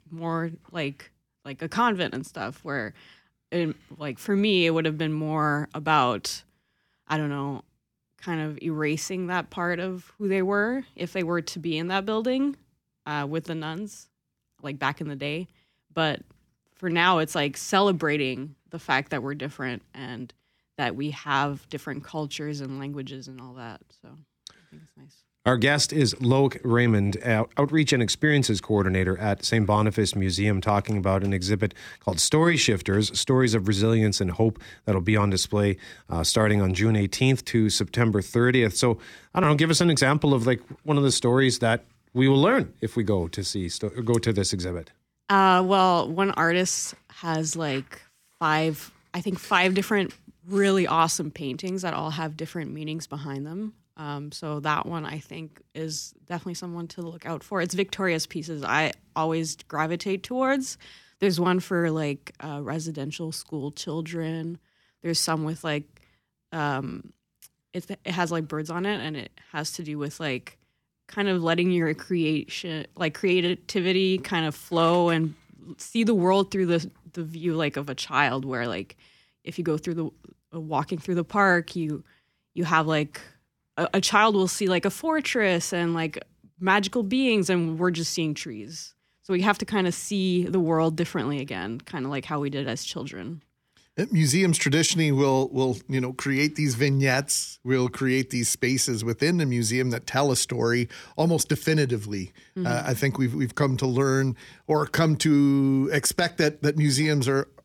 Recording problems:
none

